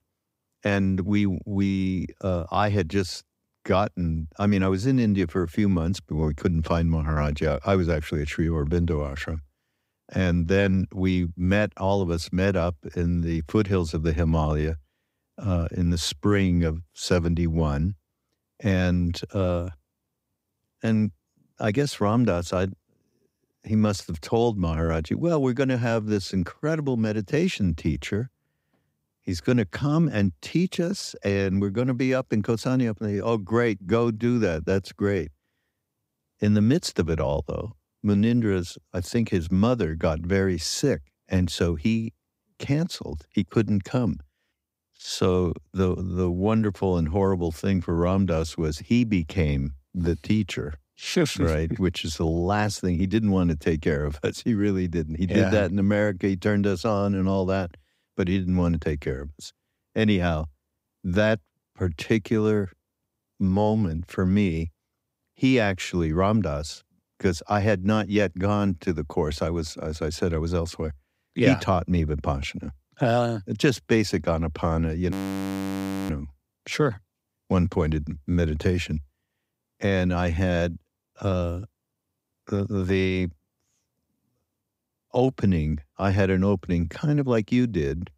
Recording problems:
audio freezing; at 1:15 for 1 s

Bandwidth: 15.5 kHz